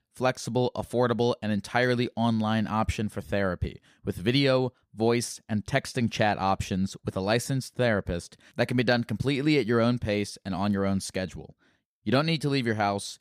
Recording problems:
none

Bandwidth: 15 kHz